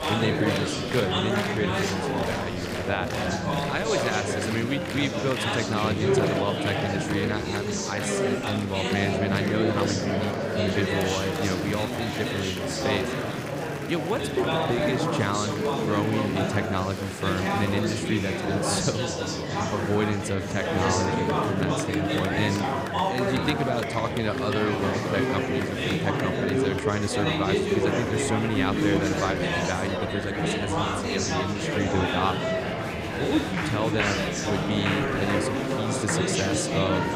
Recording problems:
murmuring crowd; very loud; throughout; 3 dB above the speech

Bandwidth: 15.5 kHz